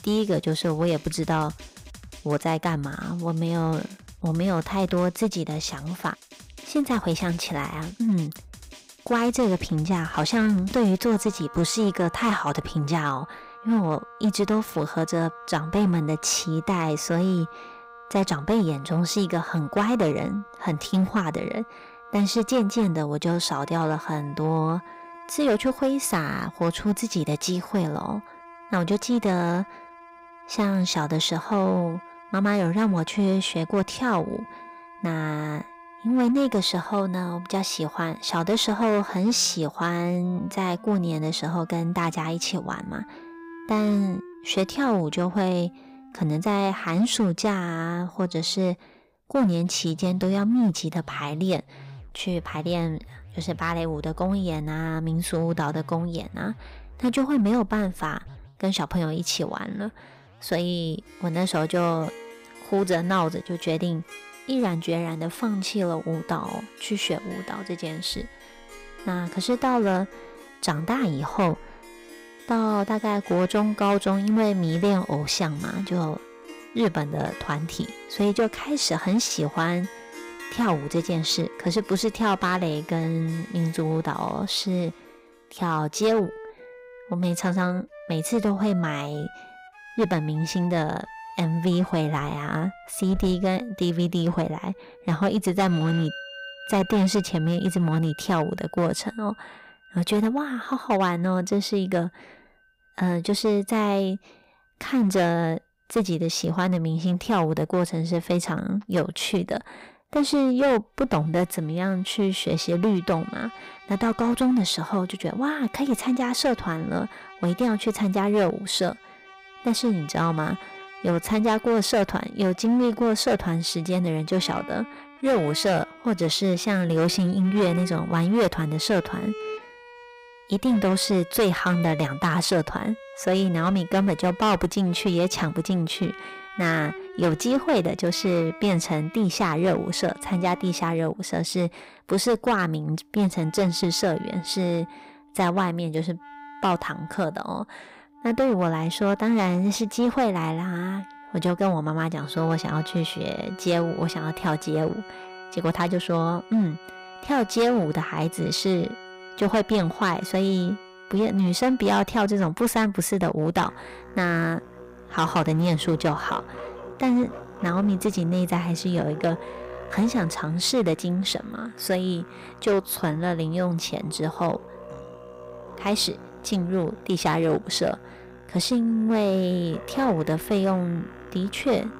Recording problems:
distortion; slight; 6% of the sound clipped
background music; noticeable; throughout; 20 dB below the speech

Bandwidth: 15.5 kHz